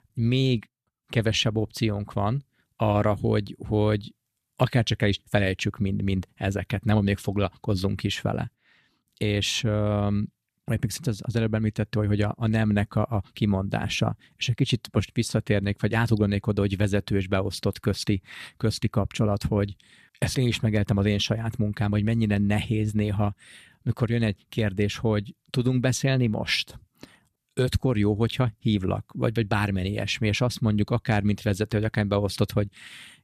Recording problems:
none

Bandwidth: 14.5 kHz